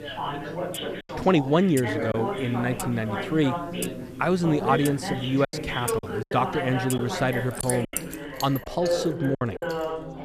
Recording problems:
background chatter; loud; throughout; 4 voices, 6 dB below the speech
household noises; noticeable; throughout; 15 dB below the speech
choppy; occasionally; 5% of the speech affected

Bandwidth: 14.5 kHz